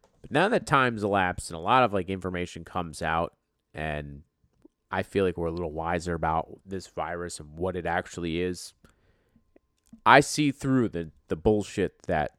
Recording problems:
none

